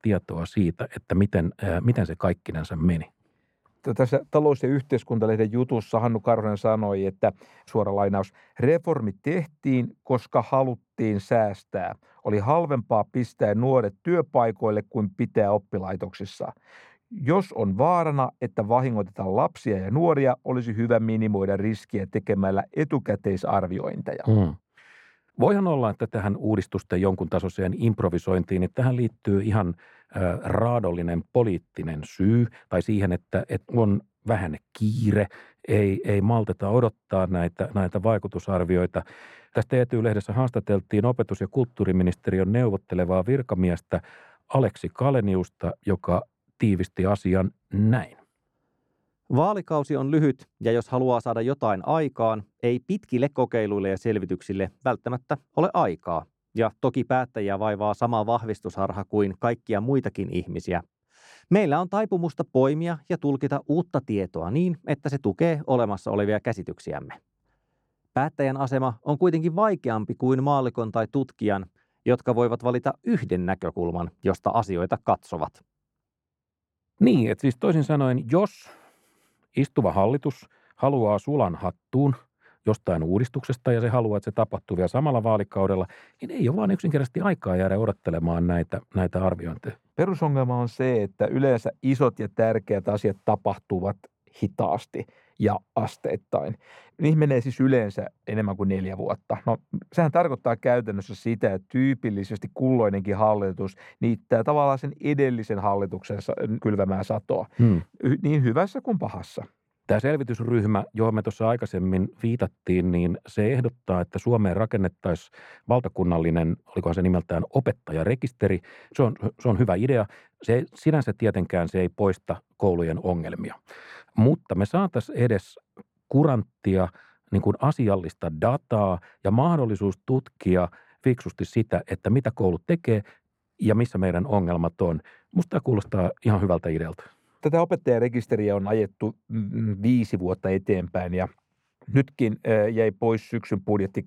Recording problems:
muffled; very; fading above 2 kHz

